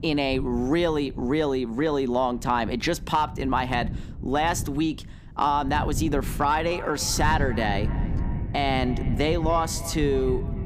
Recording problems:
echo of what is said; noticeable; from 6.5 s on; 290 ms later, 20 dB below the speech
wind noise on the microphone; occasional gusts; 20 dB below the speech

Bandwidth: 15 kHz